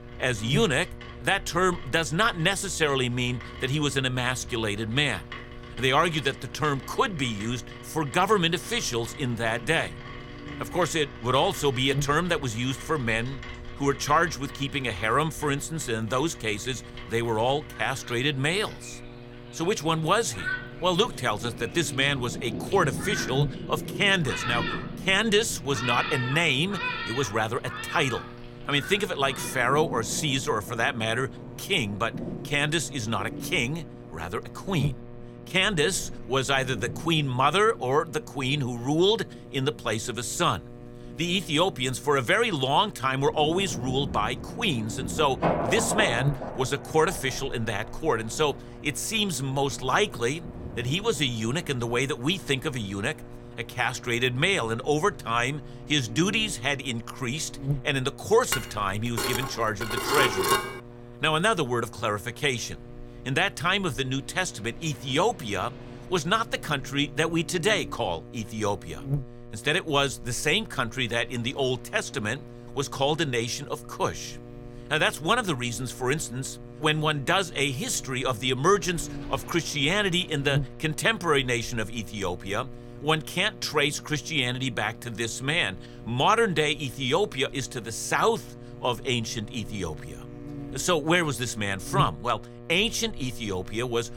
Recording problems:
rain or running water; noticeable; throughout; 10 dB below the speech
electrical hum; faint; throughout; 60 Hz, 20 dB below the speech
clattering dishes; loud; from 59 s to 1:01; peak 4 dB above the speech

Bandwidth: 16.5 kHz